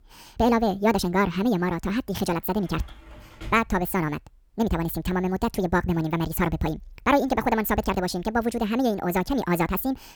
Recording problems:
wrong speed and pitch; too fast and too high; 1.7 times normal speed
door banging; faint; at 3 s; peak 15 dB below the speech

